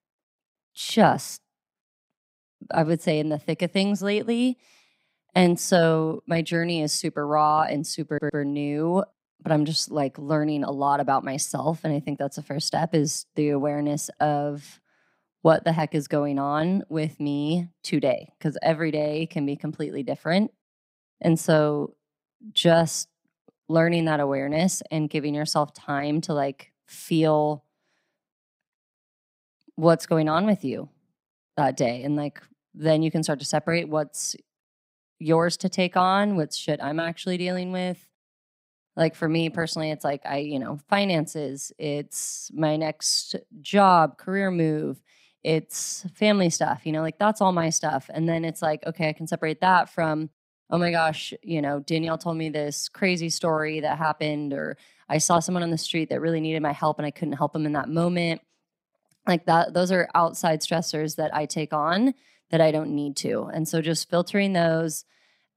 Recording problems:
audio stuttering; at 8 s

